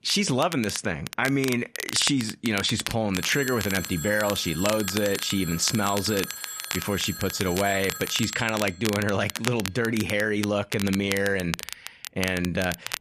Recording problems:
crackle, like an old record; loud; 9 dB below the speech
phone ringing; noticeable; from 3 to 9 s; peak 9 dB below the speech

